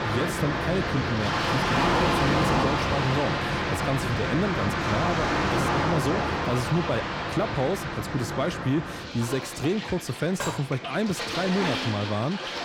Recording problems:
distortion; slight; 10 dB below the speech
rain or running water; very loud; throughout; 1 dB above the speech
clattering dishes; noticeable; at 10 s; peak 4 dB below the speech

